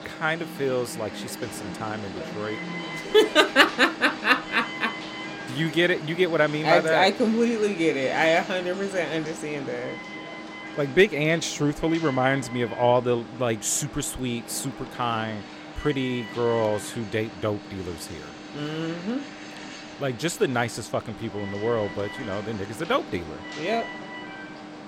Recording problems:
alarms or sirens; noticeable; throughout; 10 dB below the speech

